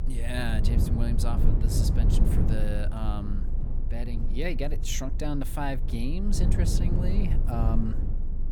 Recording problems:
low rumble; loud; throughout; 5 dB below the speech

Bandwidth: 18 kHz